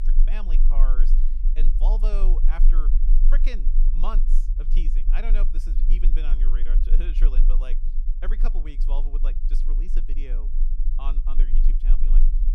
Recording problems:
low rumble; noticeable; throughout; 10 dB below the speech

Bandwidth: 15 kHz